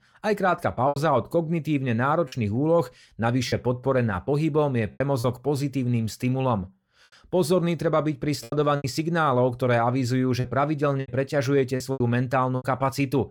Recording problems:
choppy; very; 6% of the speech affected

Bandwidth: 17 kHz